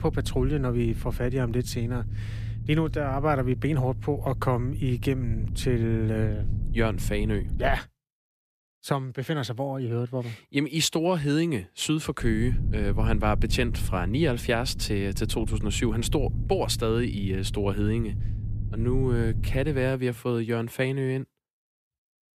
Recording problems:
low rumble; noticeable; until 8 s and from 12 to 20 s; 15 dB below the speech

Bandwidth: 14.5 kHz